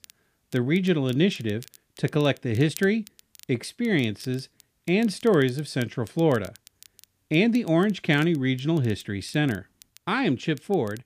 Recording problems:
crackle, like an old record; faint; 25 dB below the speech

